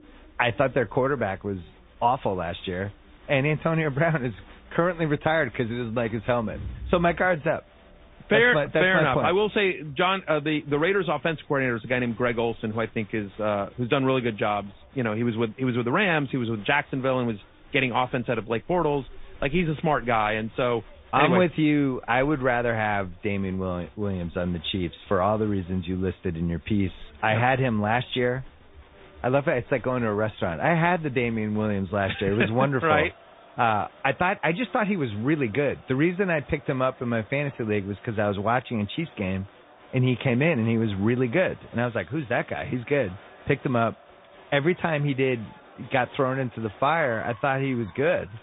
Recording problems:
high frequencies cut off; severe; nothing above 3.5 kHz
garbled, watery; slightly
crowd noise; faint; throughout; 25 dB below the speech

